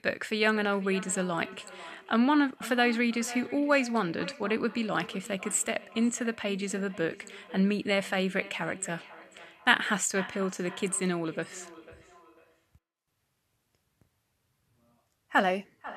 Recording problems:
echo of what is said; noticeable; throughout; 490 ms later, 20 dB below the speech

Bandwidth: 13.5 kHz